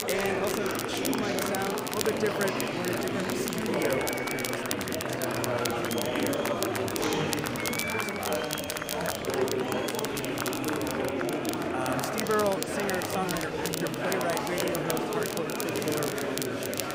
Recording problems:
murmuring crowd; very loud; throughout; 4 dB above the speech
crackle, like an old record; loud; 2 dB below the speech

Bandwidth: 15.5 kHz